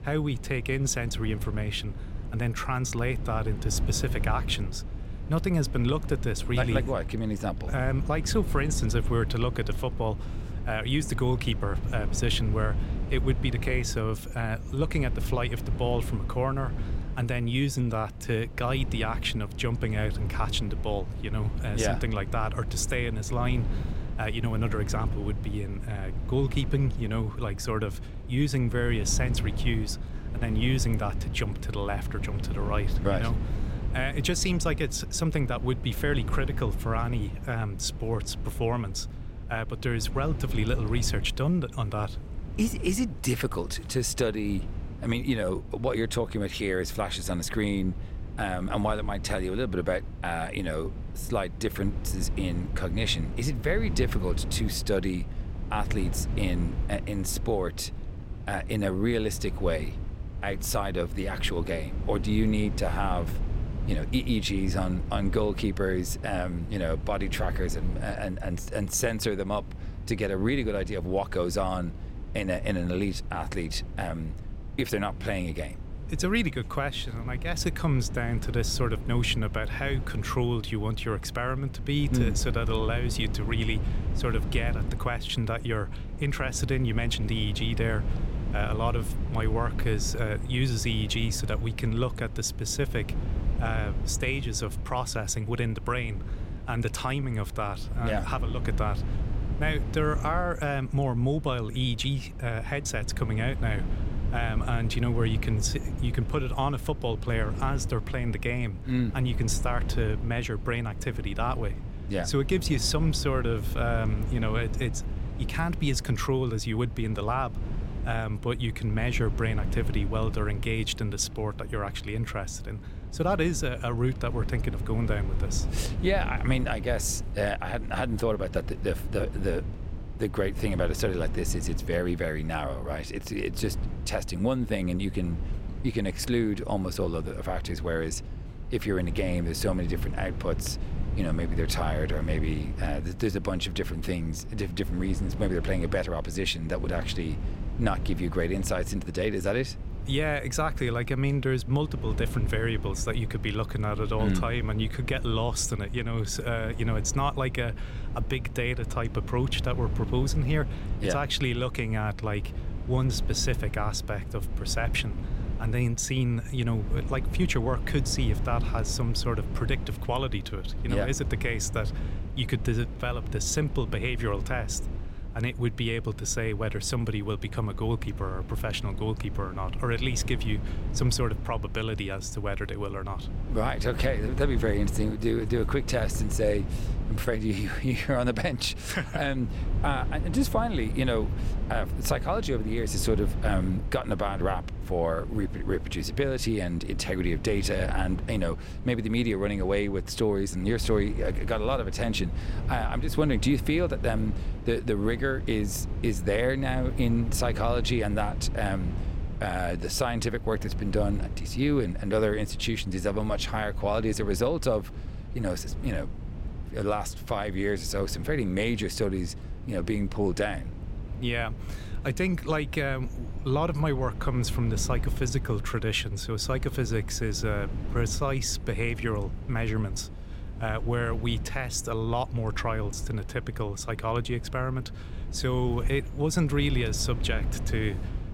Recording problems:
low rumble; noticeable; throughout; 15 dB below the speech

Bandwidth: 16 kHz